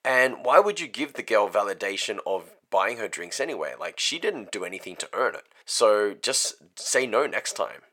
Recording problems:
thin; very; fading below 550 Hz

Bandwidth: 17 kHz